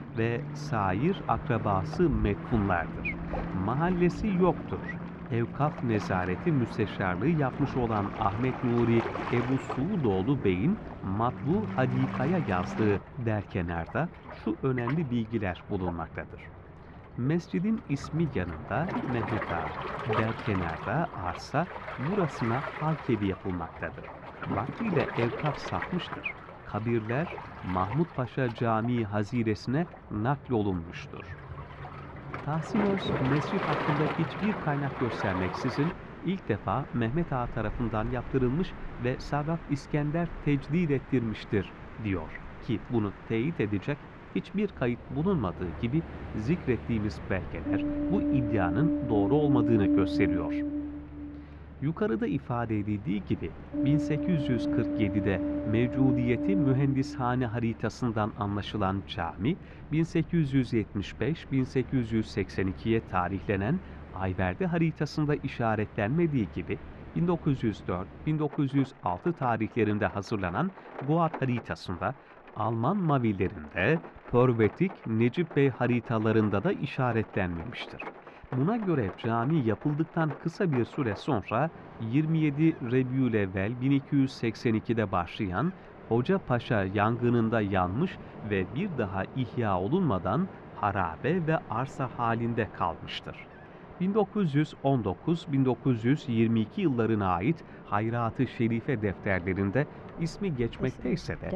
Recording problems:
muffled; very; fading above 1.5 kHz
rain or running water; loud; throughout; 8 dB below the speech

